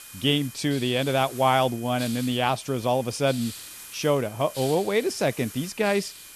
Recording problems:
hiss; noticeable; throughout; 15 dB below the speech
high-pitched whine; faint; throughout; 2.5 kHz, 25 dB below the speech

